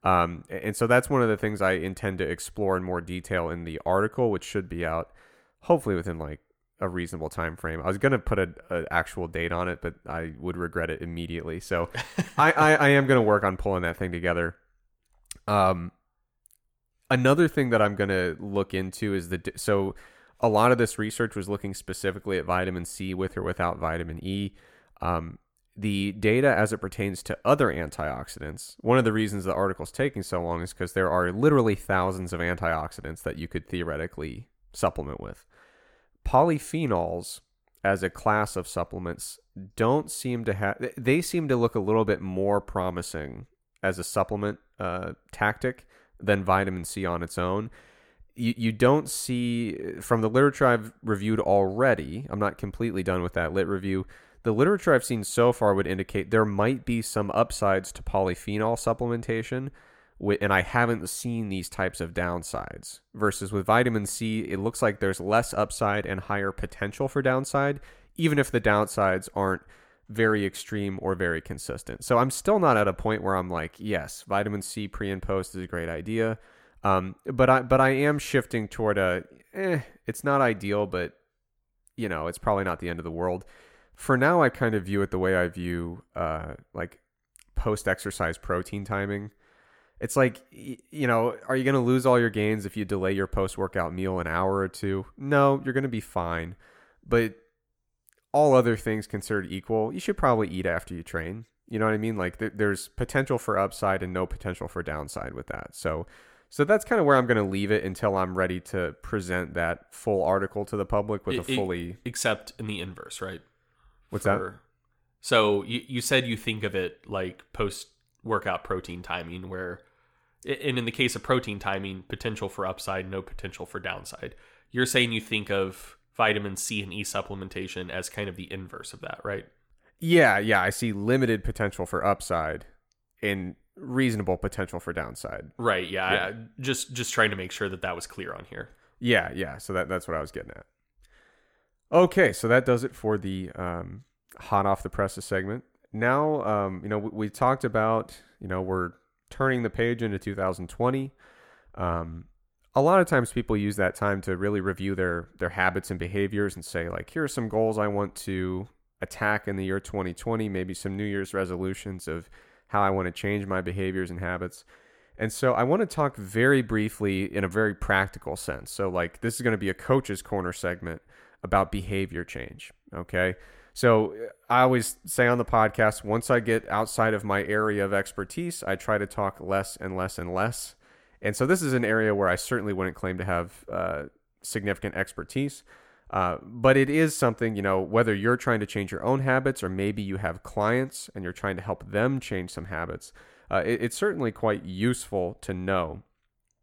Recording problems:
none

